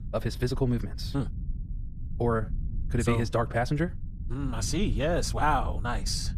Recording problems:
wrong speed, natural pitch; too fast; 1.5 times normal speed
low rumble; faint; throughout; 20 dB below the speech

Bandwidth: 15 kHz